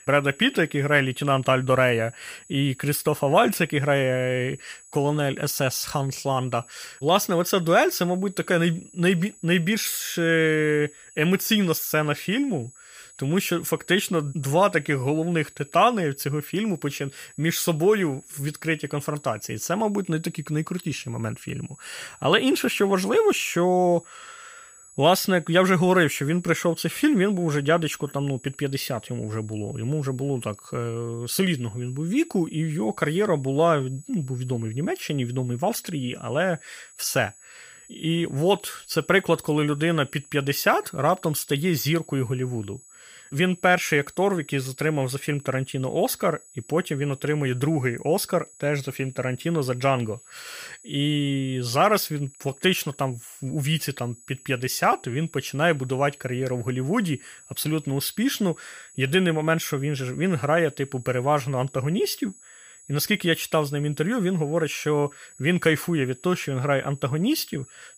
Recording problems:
high-pitched whine; faint; throughout; 8 kHz, 25 dB below the speech

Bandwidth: 15 kHz